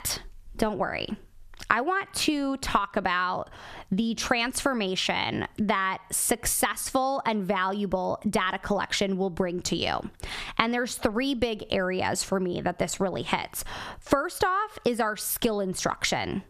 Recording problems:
squashed, flat; heavily

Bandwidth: 14.5 kHz